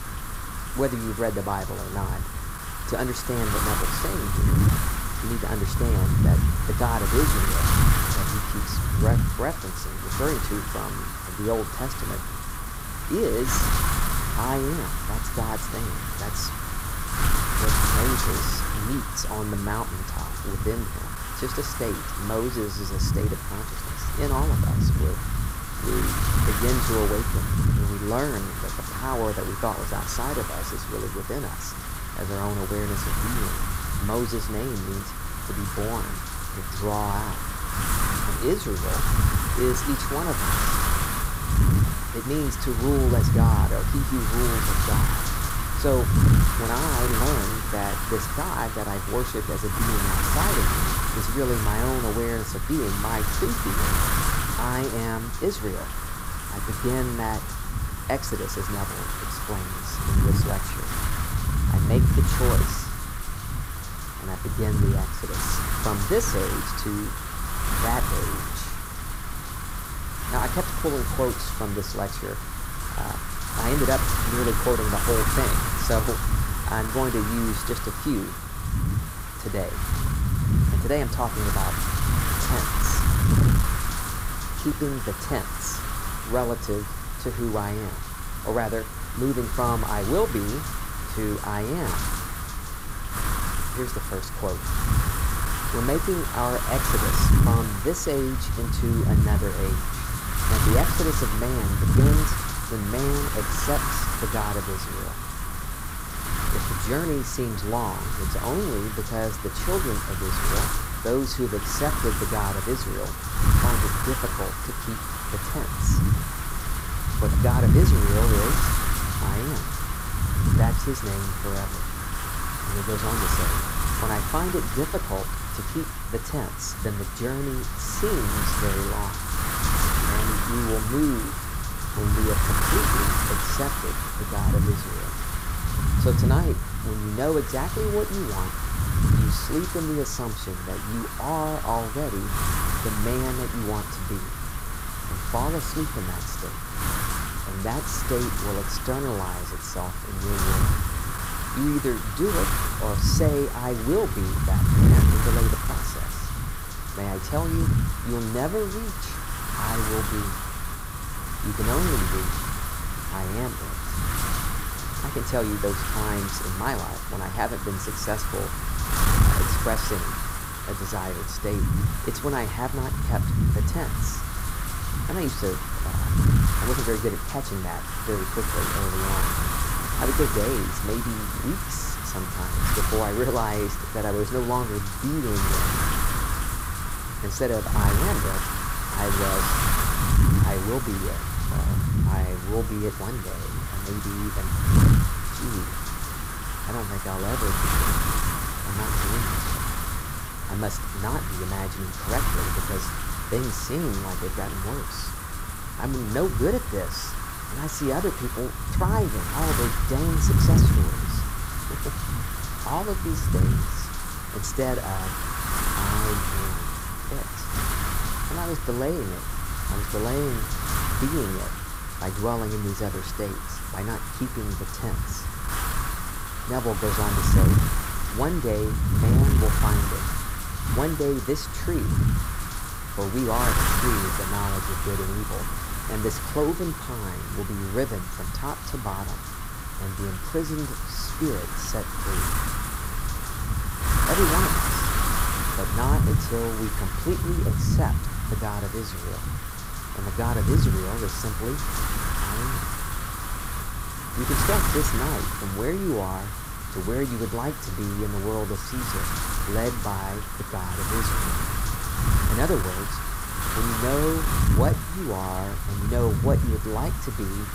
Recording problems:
wind noise on the microphone; heavy; 1 dB above the speech

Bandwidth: 15.5 kHz